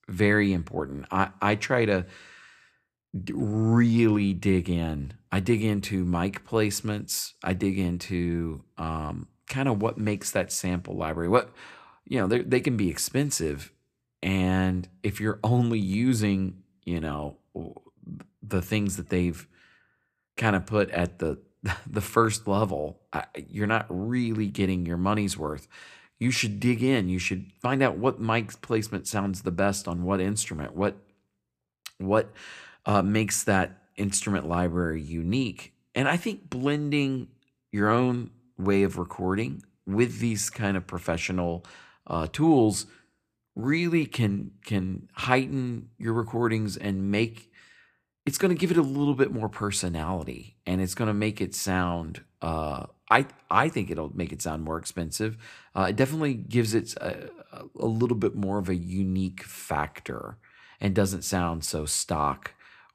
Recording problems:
none

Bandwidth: 14.5 kHz